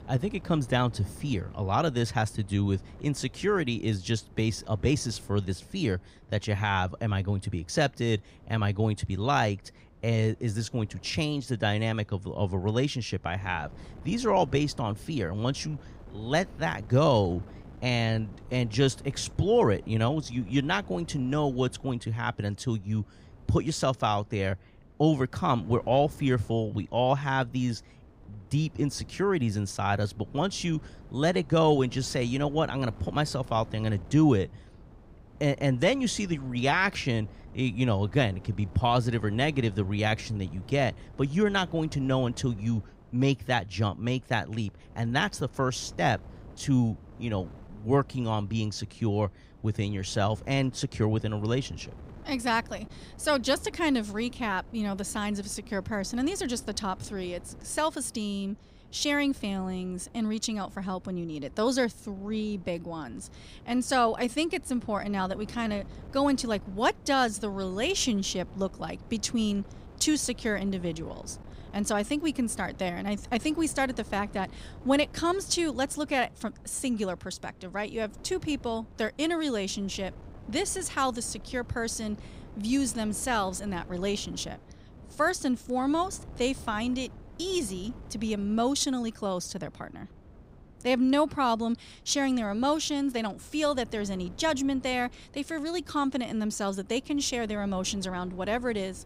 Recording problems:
wind noise on the microphone; occasional gusts; 25 dB below the speech

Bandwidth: 15.5 kHz